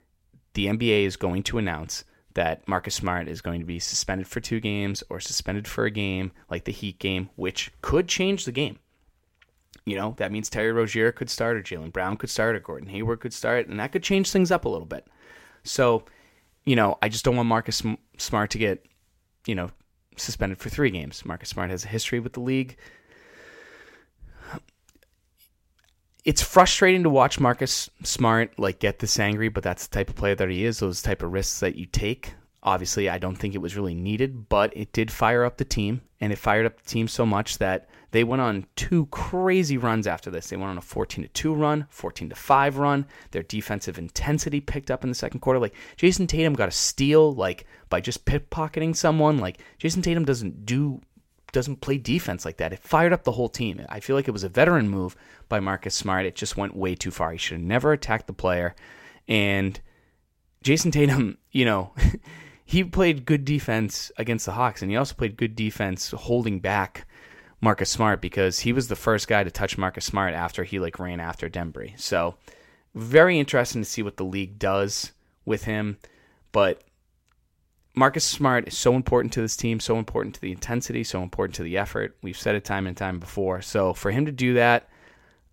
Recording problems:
none

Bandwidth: 16 kHz